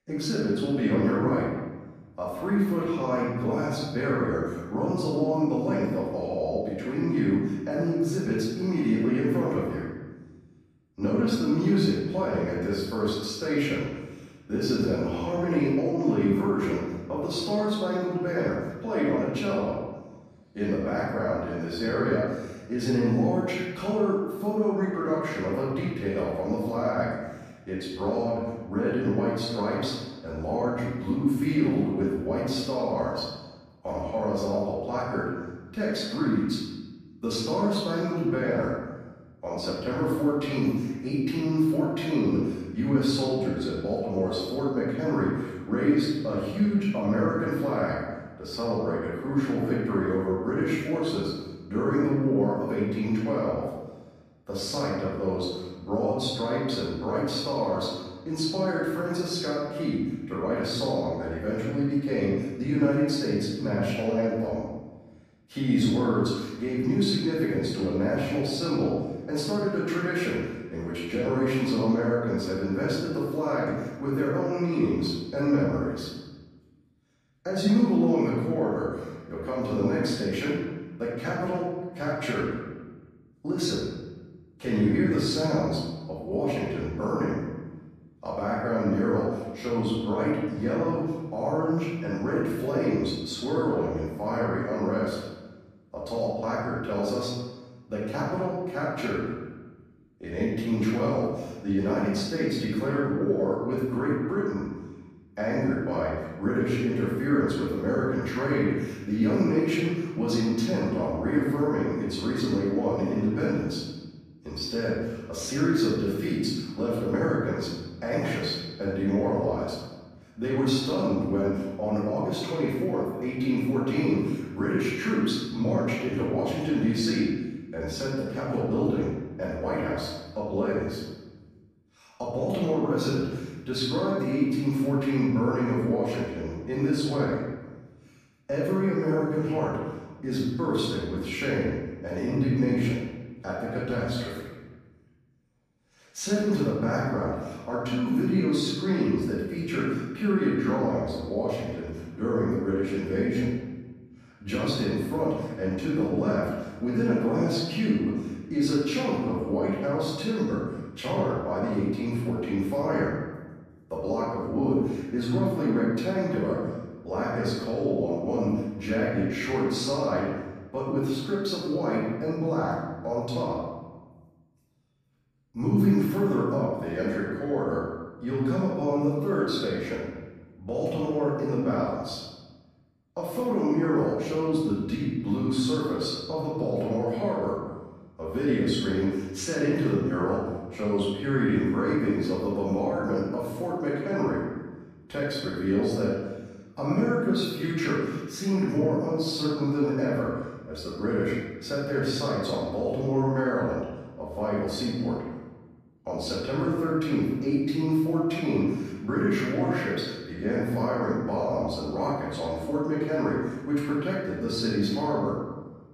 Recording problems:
off-mic speech; far
room echo; noticeable; dies away in 1.1 s

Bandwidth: 14.5 kHz